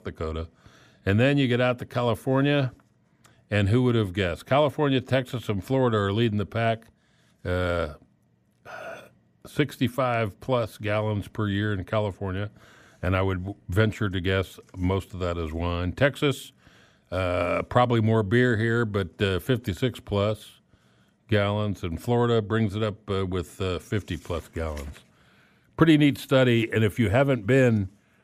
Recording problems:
none

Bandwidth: 15 kHz